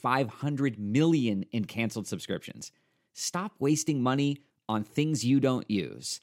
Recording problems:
none

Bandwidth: 16 kHz